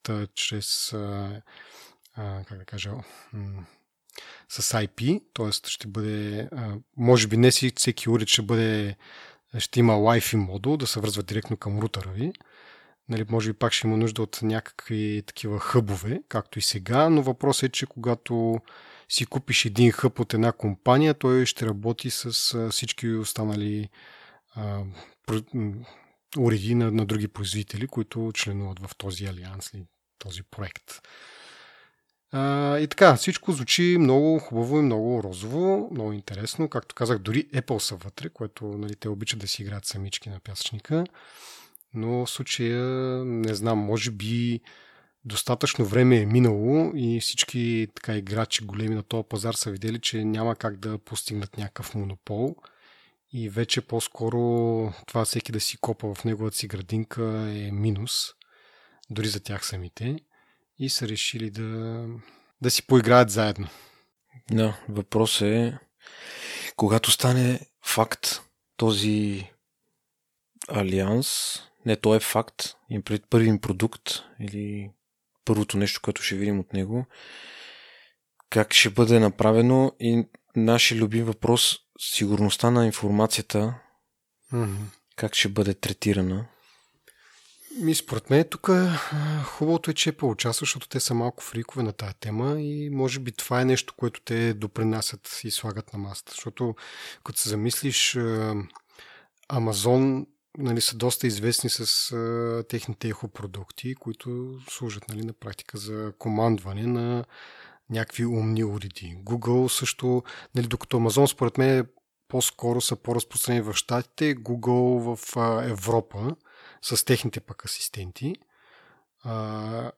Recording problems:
none

